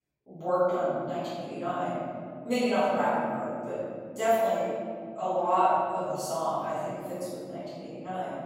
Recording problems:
room echo; strong; dies away in 2.7 s
off-mic speech; far

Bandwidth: 16 kHz